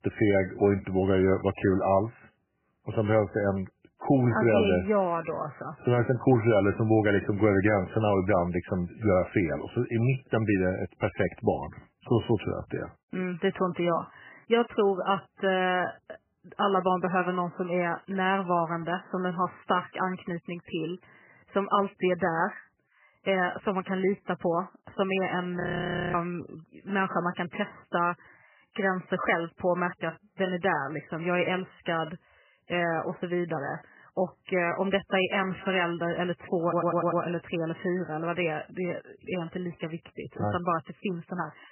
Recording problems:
garbled, watery; badly; nothing above 3 kHz
audio freezing; at 26 s for 0.5 s
audio stuttering; at 37 s

